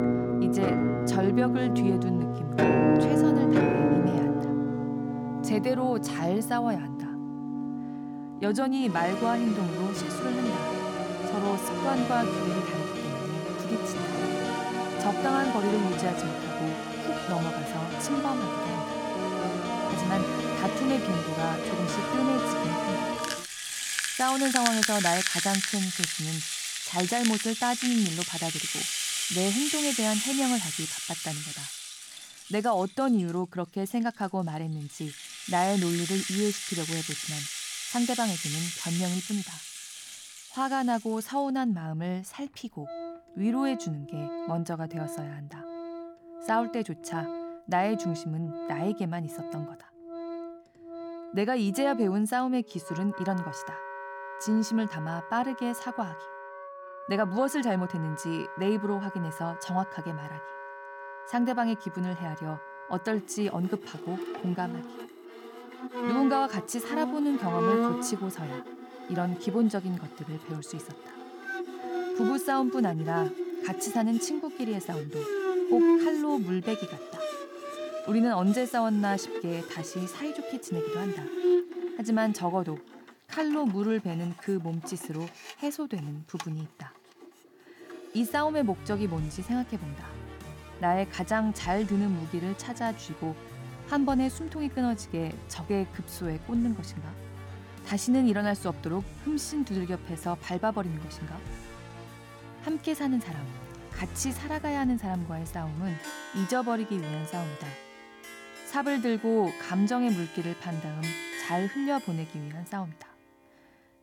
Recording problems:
background music; loud; throughout; 1 dB below the speech

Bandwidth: 17.5 kHz